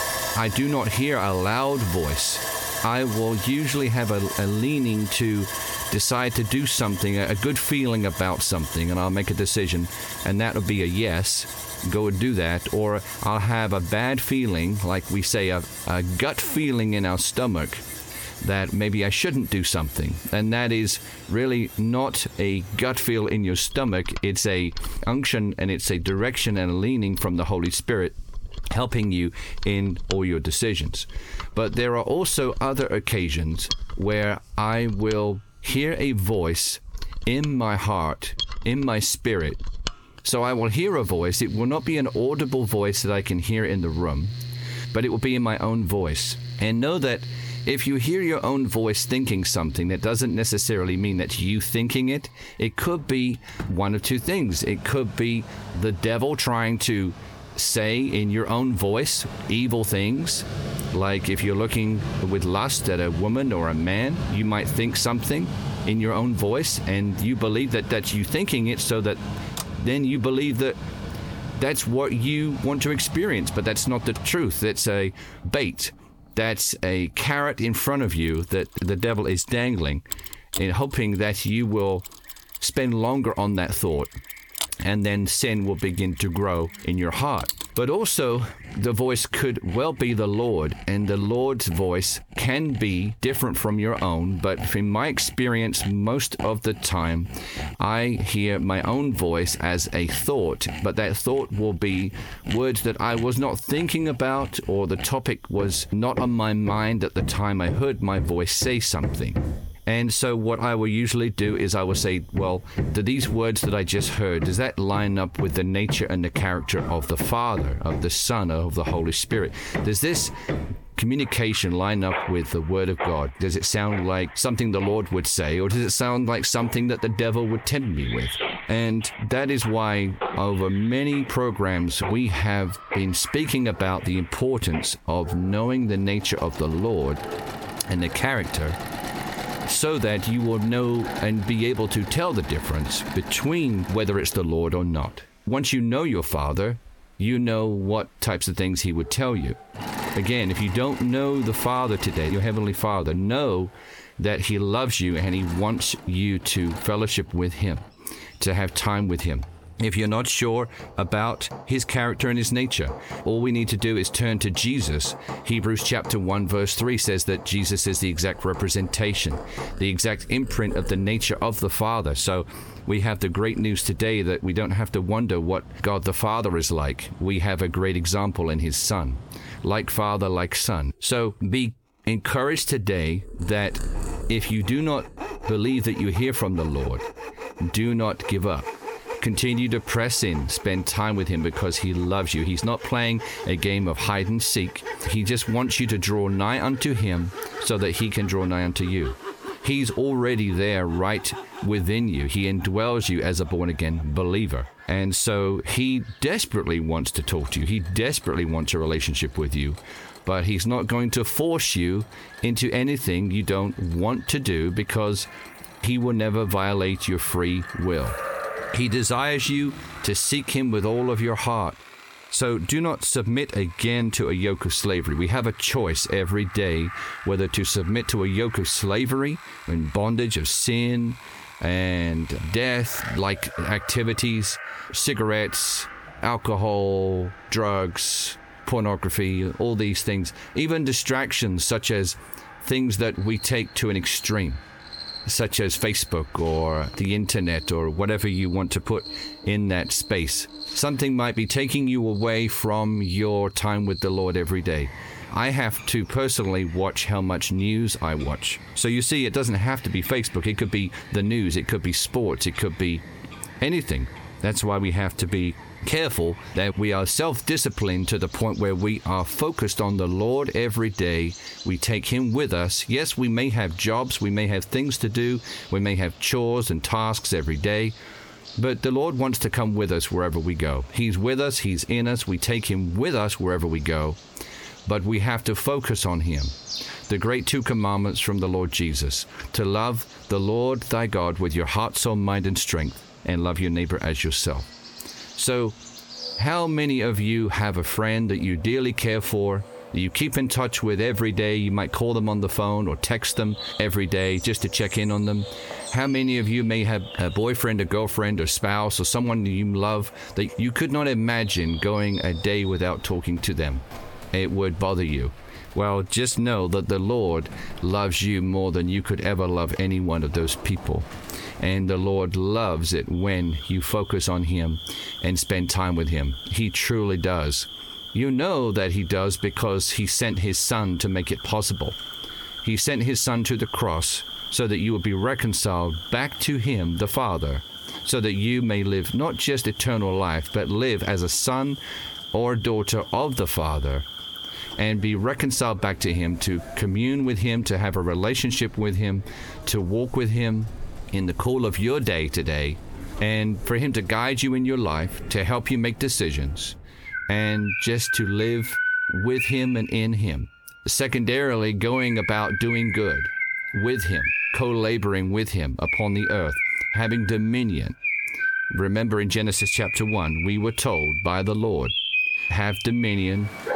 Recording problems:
squashed, flat; heavily, background pumping
animal sounds; noticeable; throughout; 10 dB below the speech
machinery noise; noticeable; throughout; 15 dB below the speech

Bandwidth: 18.5 kHz